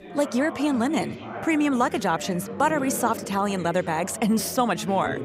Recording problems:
chatter from many people; noticeable; throughout; 10 dB below the speech

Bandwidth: 15.5 kHz